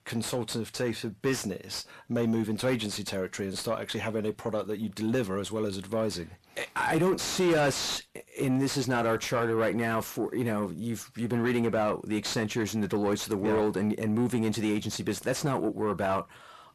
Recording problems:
distortion; heavy; 6 dB below the speech

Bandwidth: 13.5 kHz